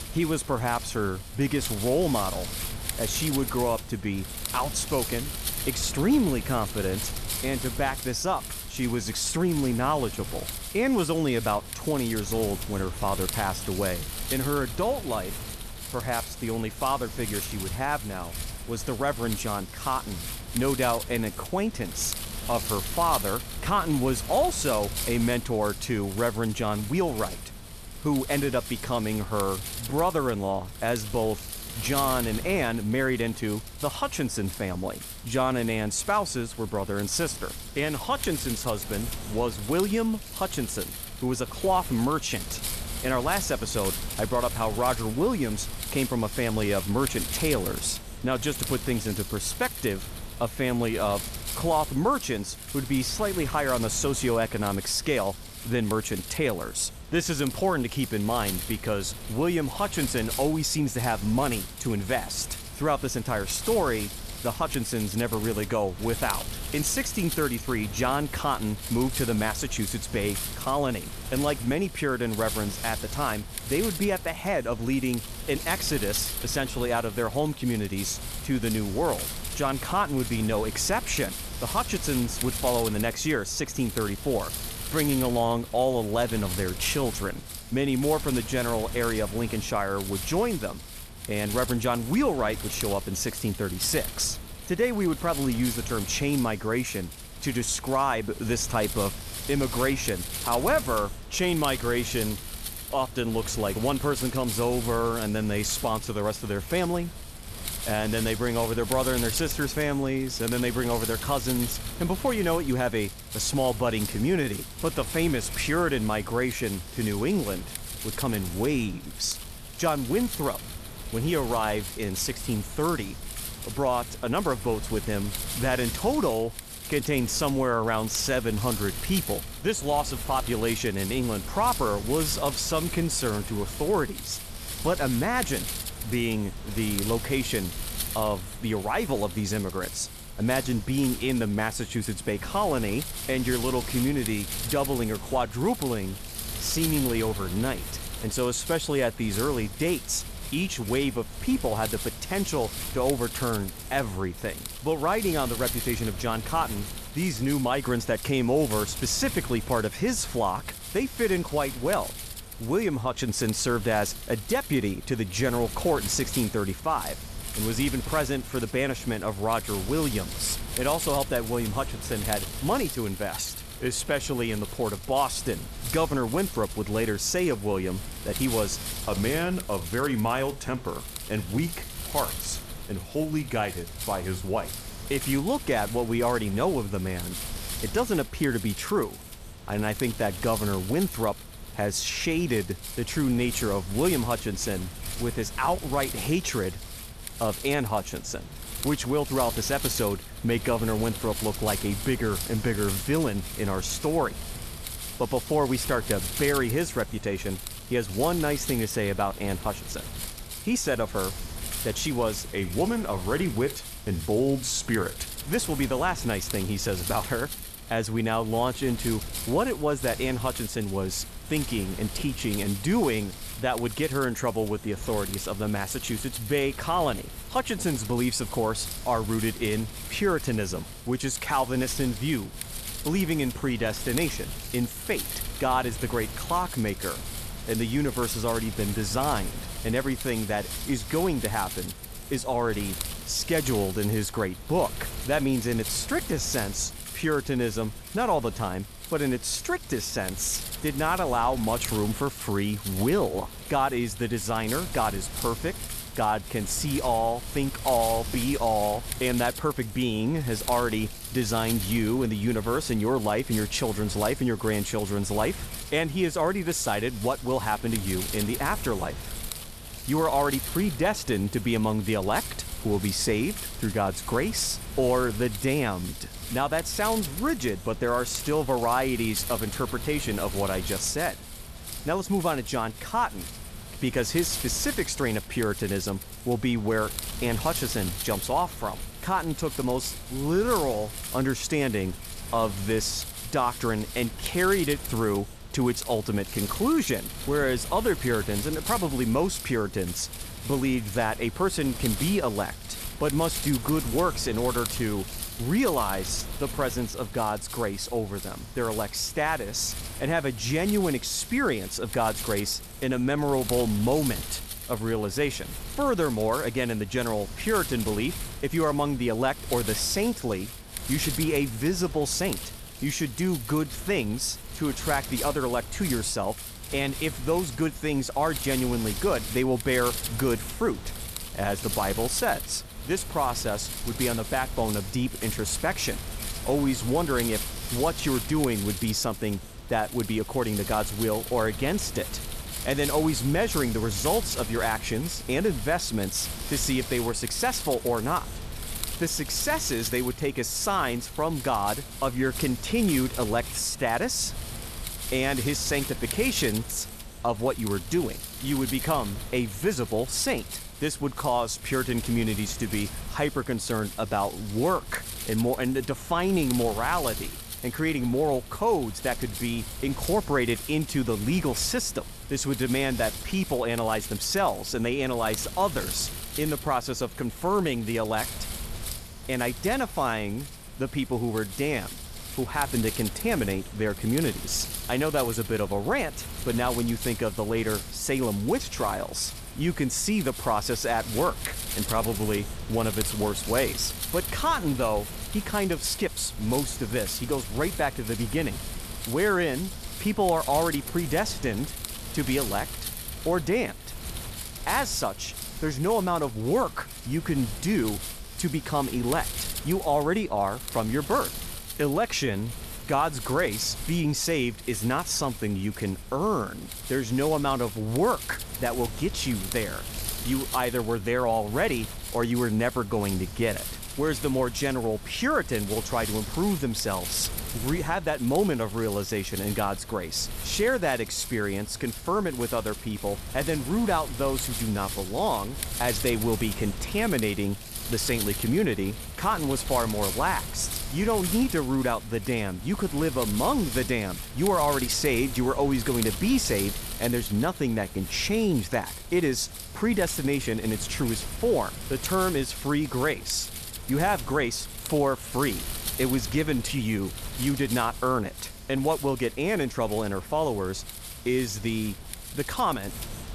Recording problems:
wind noise on the microphone; heavy; 10 dB below the speech

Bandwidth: 14 kHz